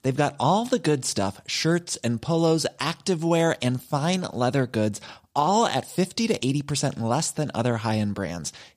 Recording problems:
none

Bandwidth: 15 kHz